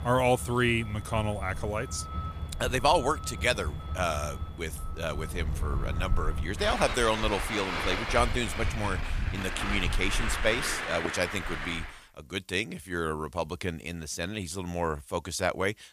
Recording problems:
traffic noise; loud; until 12 s; 4 dB below the speech

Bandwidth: 15 kHz